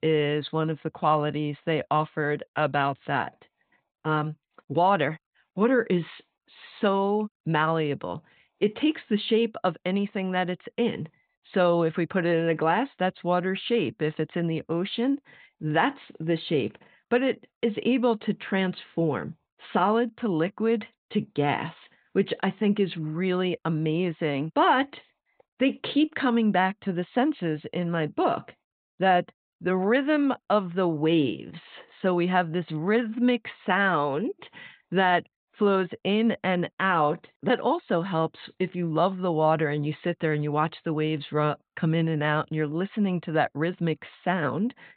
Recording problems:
high frequencies cut off; severe; nothing above 4 kHz

